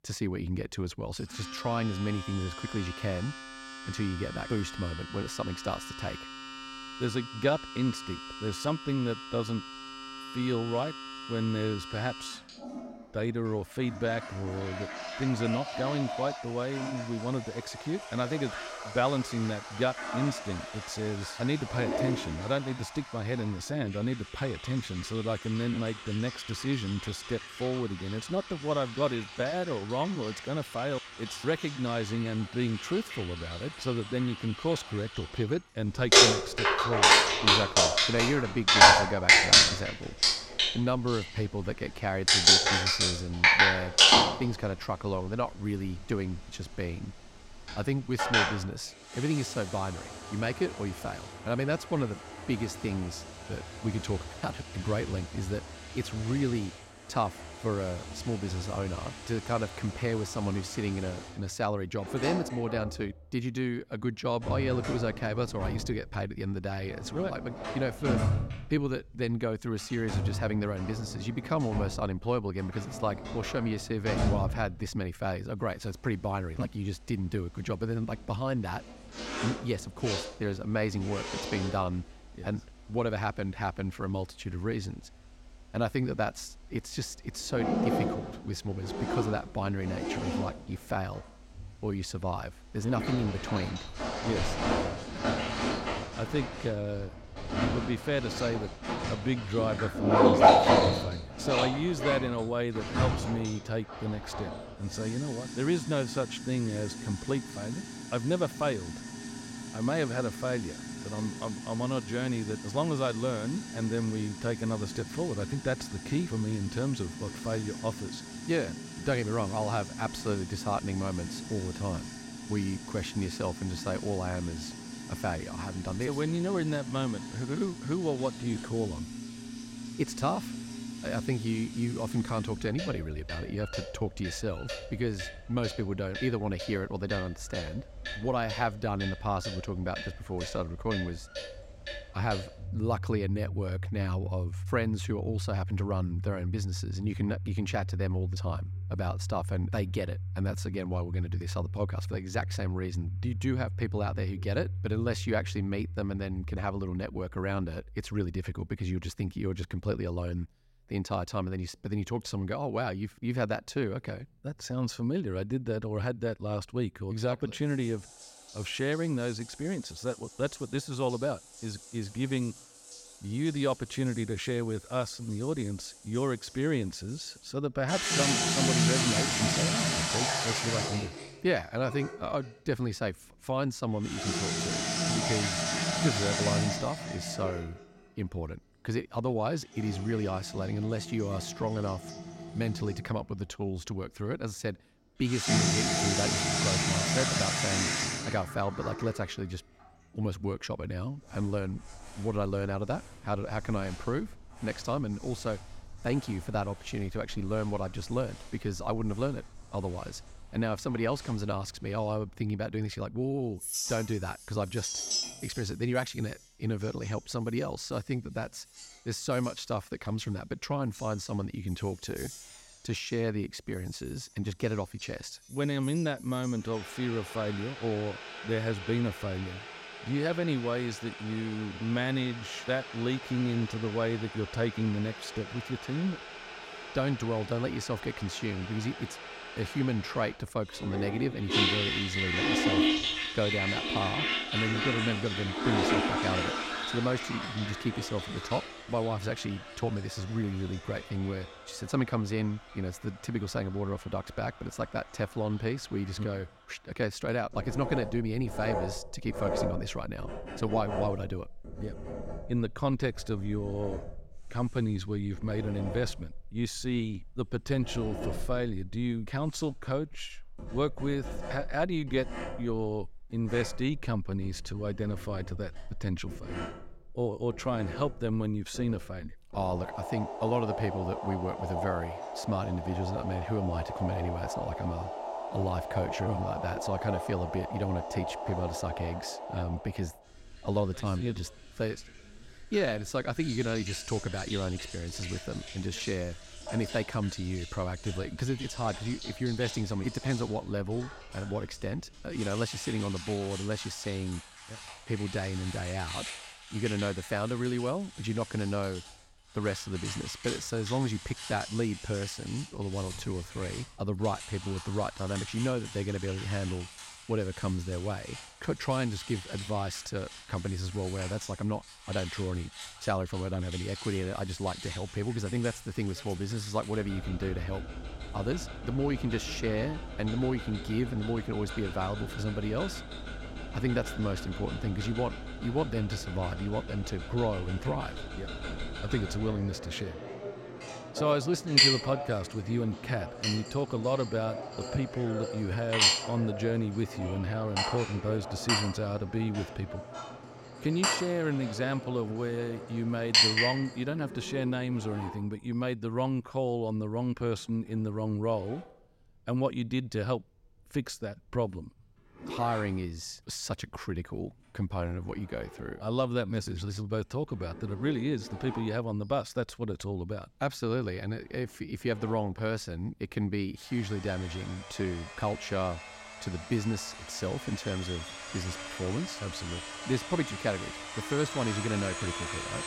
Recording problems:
household noises; very loud; throughout; 1 dB above the speech

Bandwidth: 16 kHz